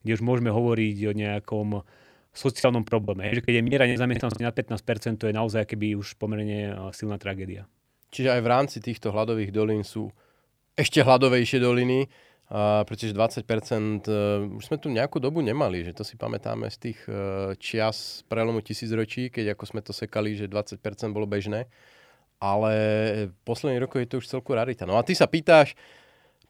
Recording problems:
choppy; very; from 2.5 to 4.5 s; 17% of the speech affected

